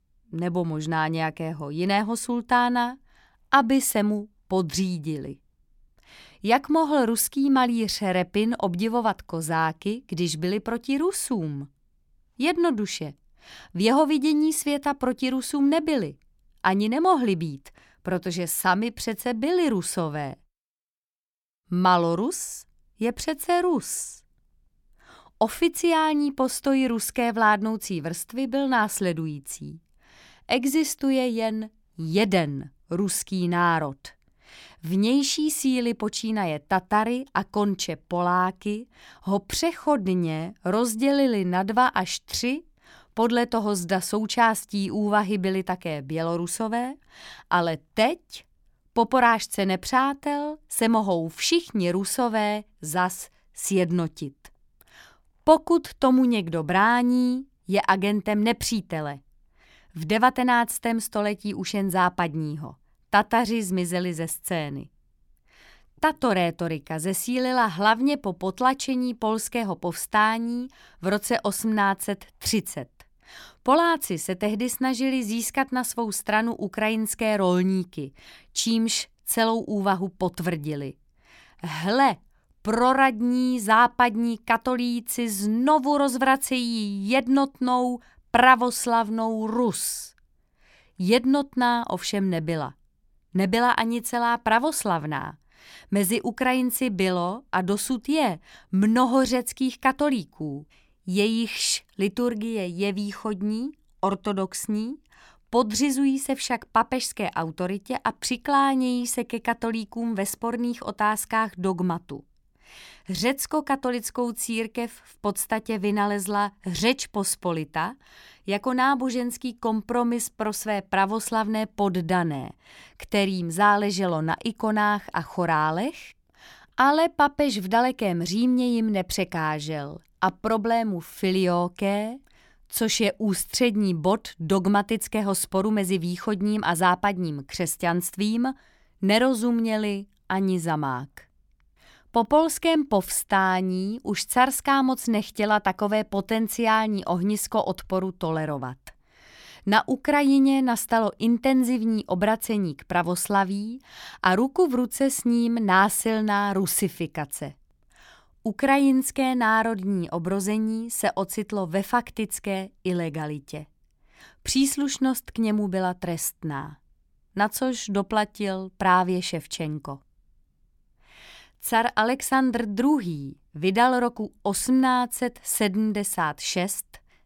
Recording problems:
none

